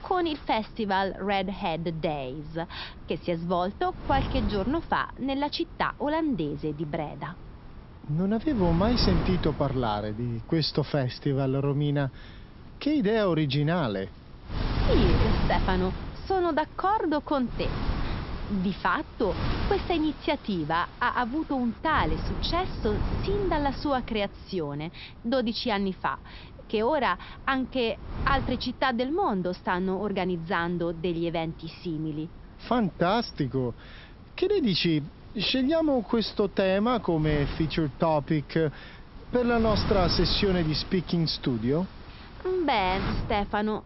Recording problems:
high frequencies cut off; noticeable; nothing above 5.5 kHz
wind noise on the microphone; occasional gusts; 10 dB below the speech

